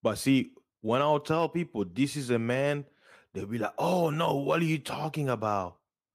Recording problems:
none

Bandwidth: 15 kHz